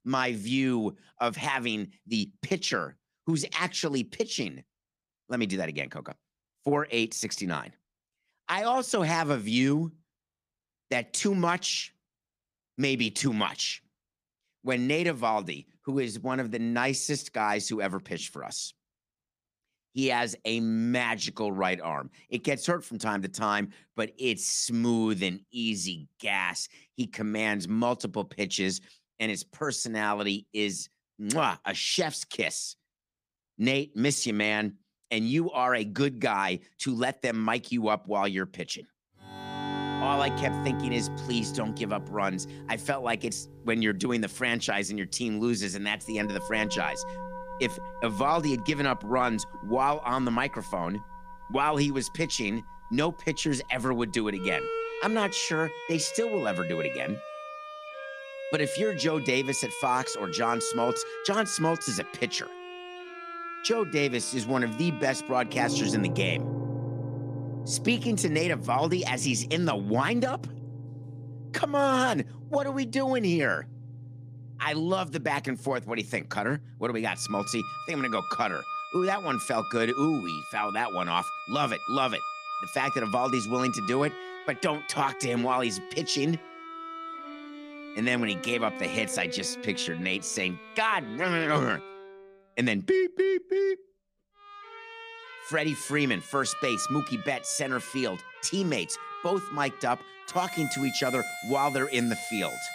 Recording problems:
background music; loud; from 40 s on; 9 dB below the speech

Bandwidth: 15 kHz